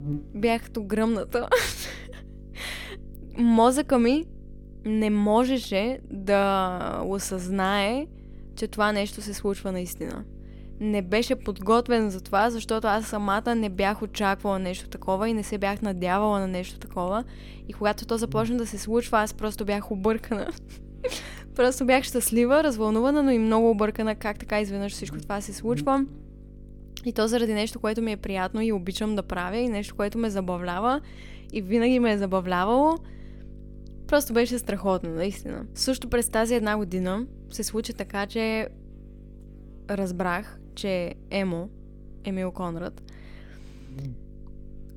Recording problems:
electrical hum; faint; throughout; 50 Hz, 25 dB below the speech

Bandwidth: 18 kHz